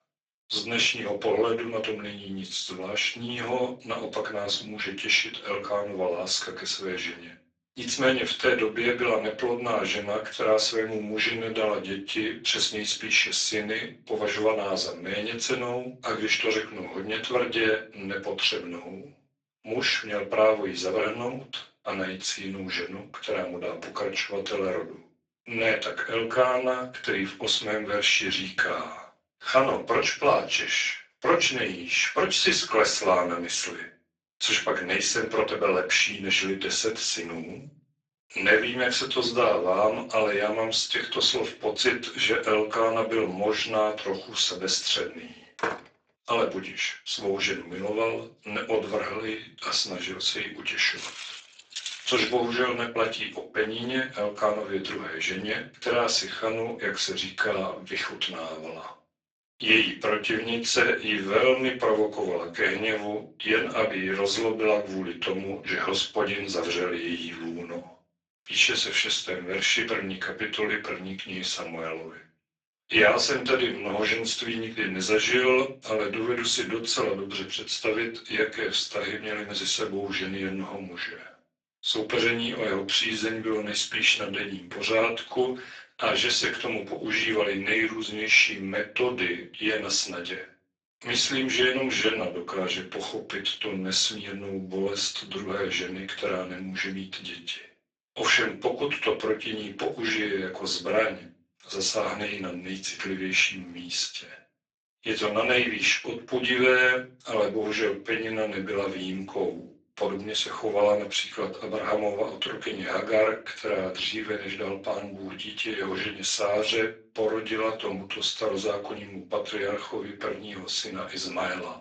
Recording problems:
off-mic speech; far
garbled, watery; badly; nothing above 7.5 kHz
thin; somewhat; fading below 450 Hz
room echo; slight; dies away in 0.3 s
door banging; noticeable; at 46 s; peak 5 dB below the speech
footsteps; noticeable; from 51 to 52 s; peak 8 dB below the speech

